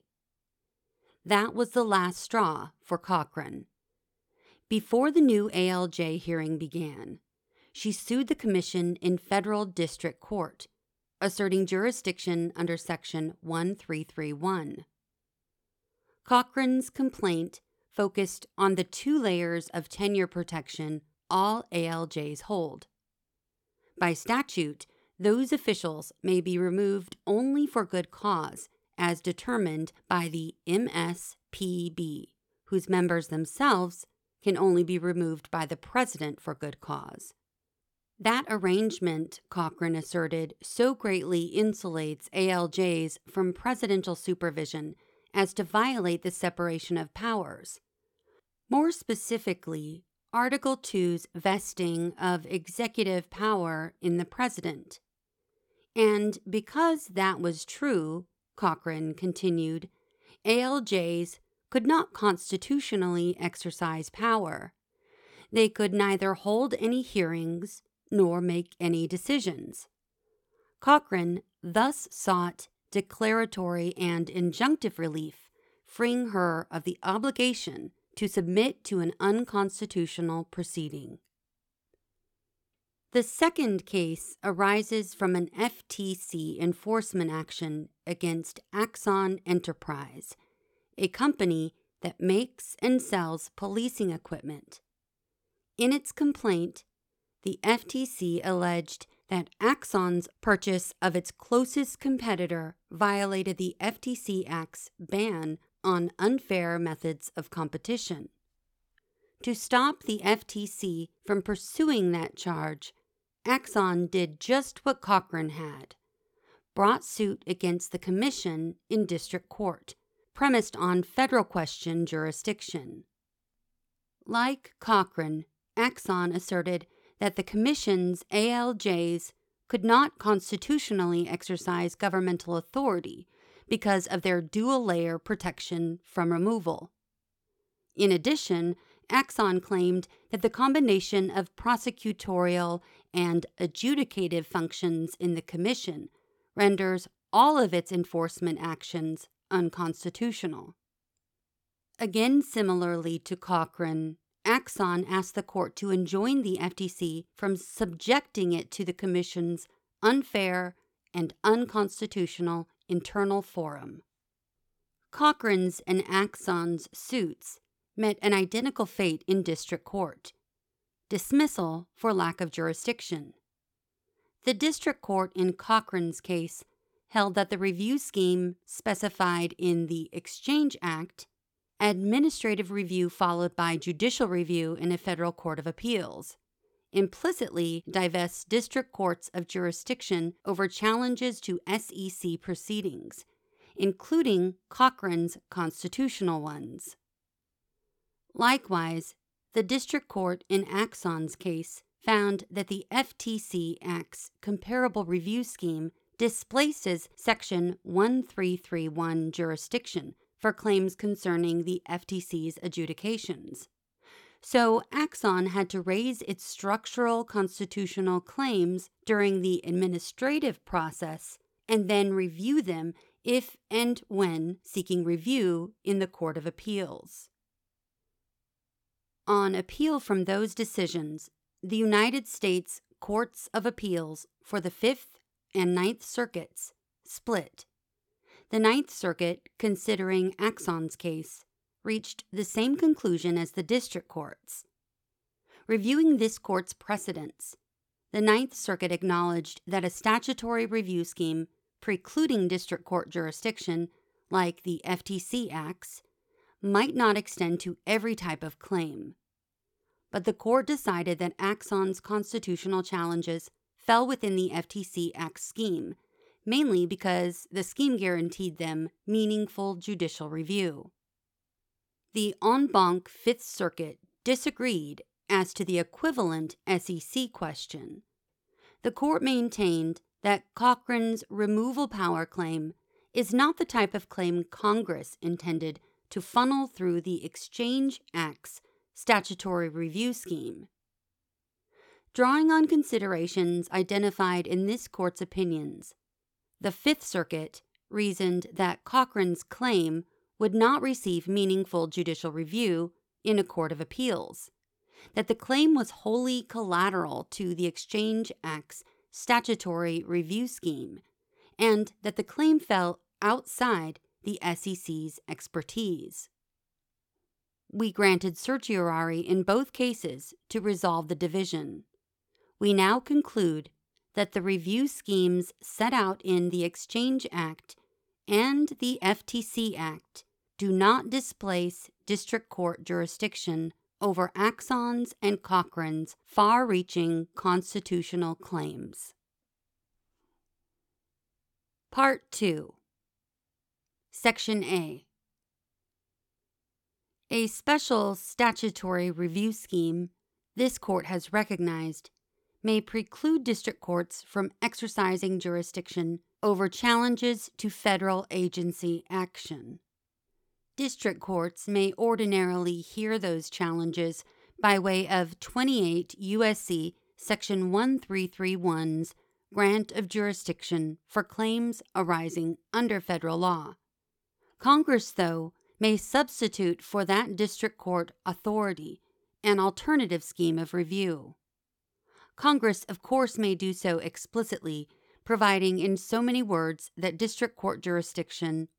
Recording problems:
none

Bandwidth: 17.5 kHz